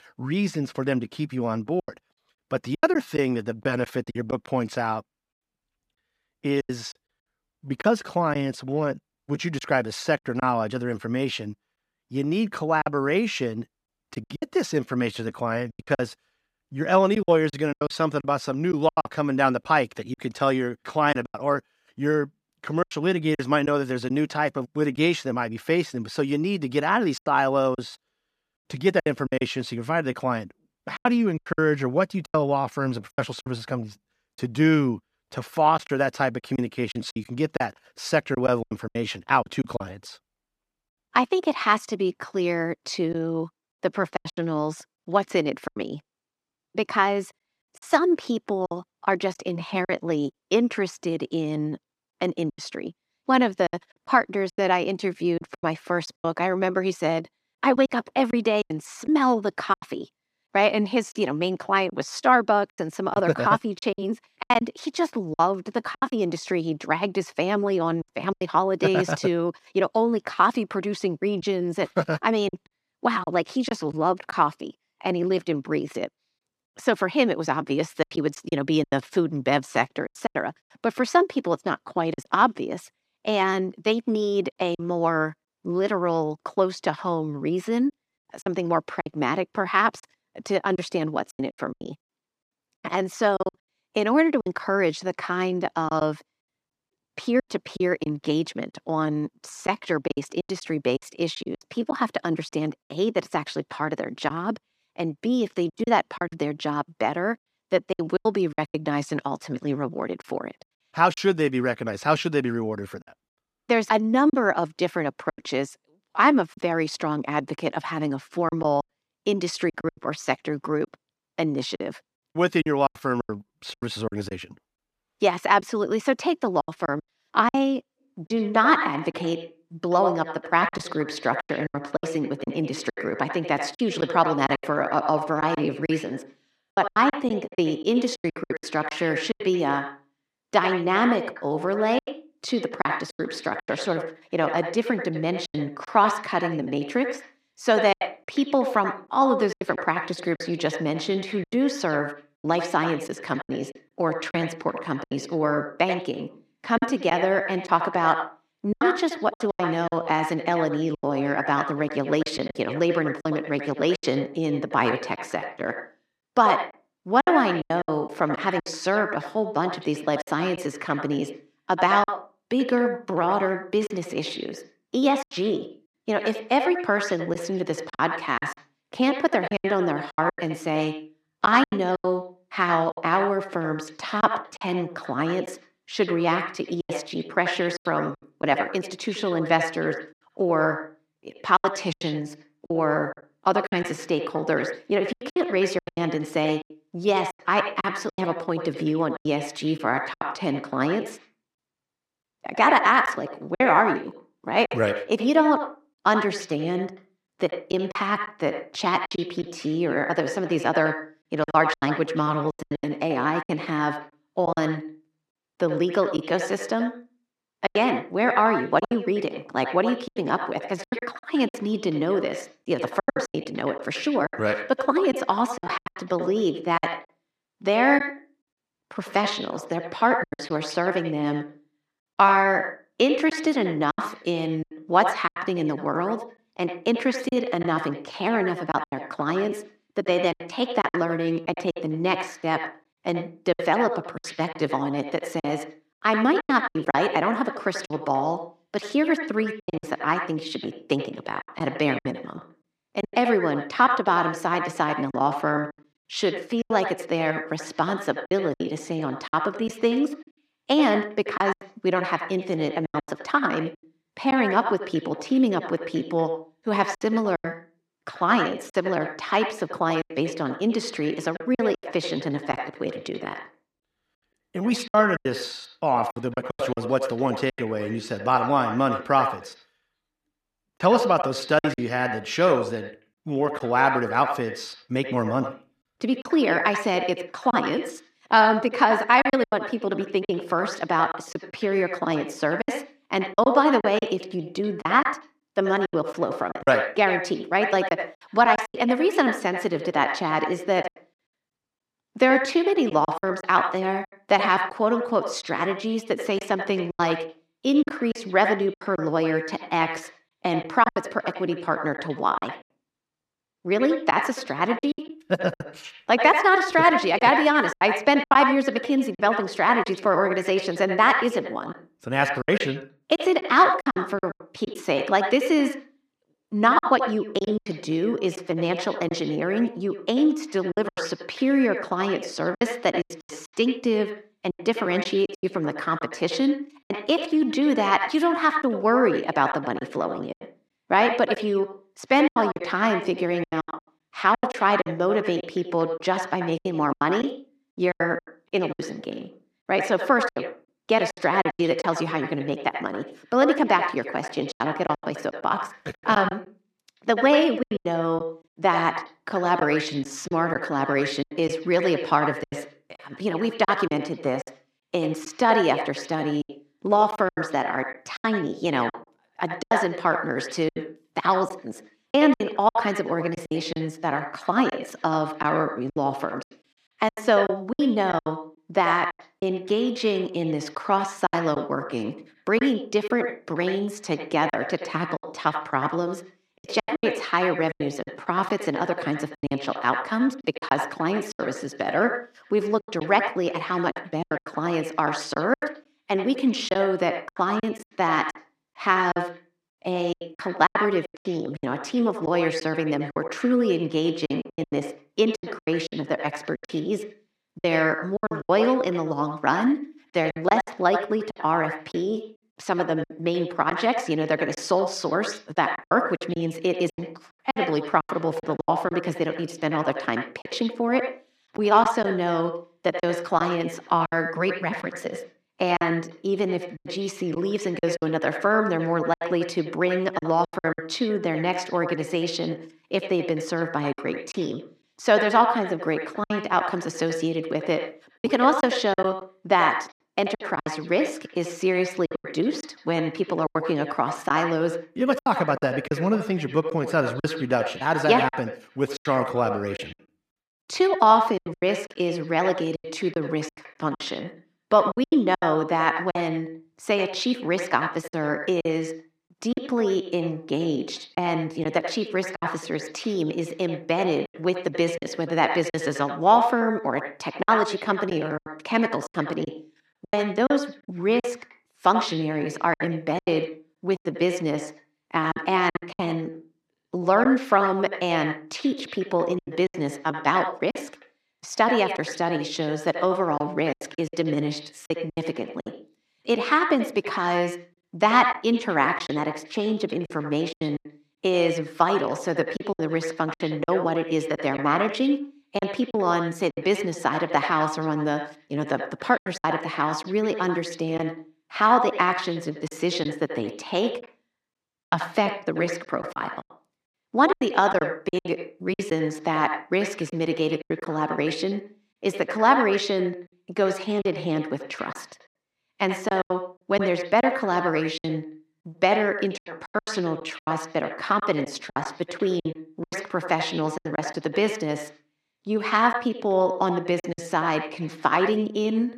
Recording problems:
echo of what is said; strong; from 2:08 on; 80 ms later, 7 dB below the speech
choppy; very; 8% of the speech affected

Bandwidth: 14.5 kHz